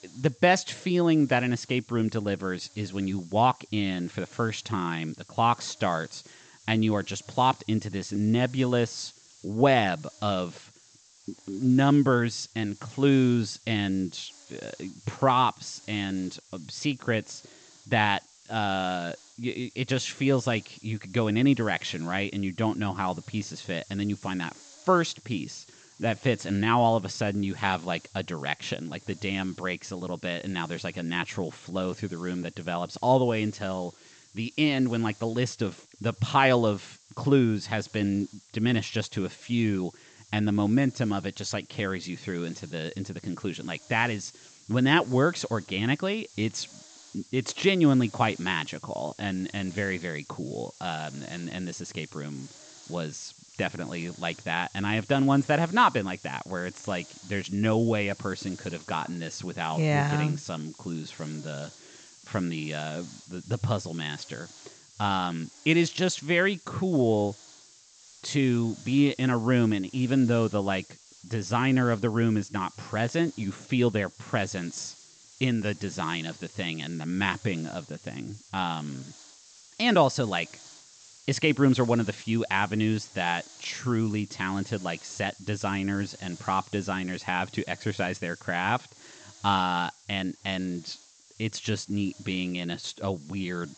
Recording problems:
high frequencies cut off; noticeable; nothing above 8 kHz
hiss; faint; throughout; 25 dB below the speech

